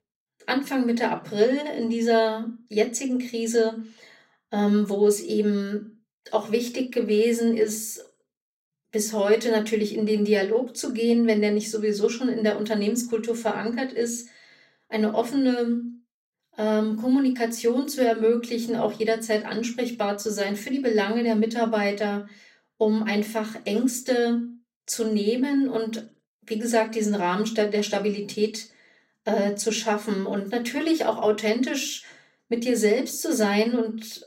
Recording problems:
off-mic speech; far
room echo; very slight; dies away in 0.3 s

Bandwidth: 16 kHz